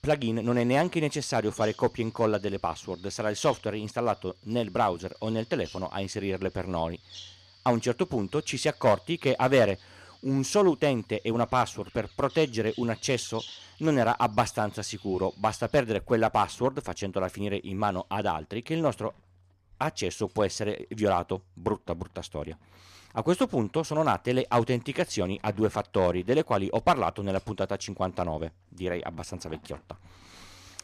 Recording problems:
animal sounds; faint; throughout; 25 dB below the speech

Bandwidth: 14.5 kHz